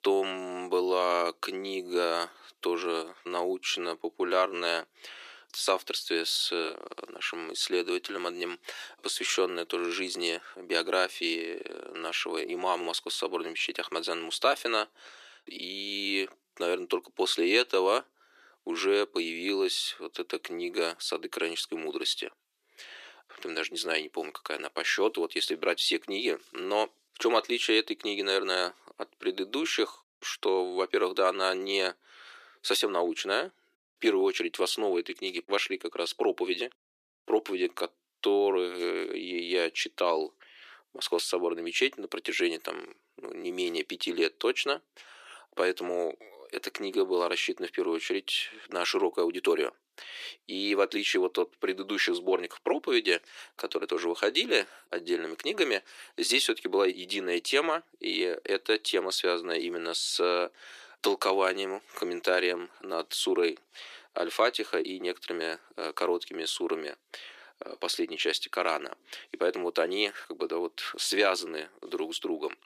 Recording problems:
thin; very; fading below 350 Hz

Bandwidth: 14.5 kHz